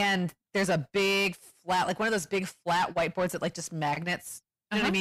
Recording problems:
distortion; heavy; 8 dB below the speech
abrupt cut into speech; at the start and the end

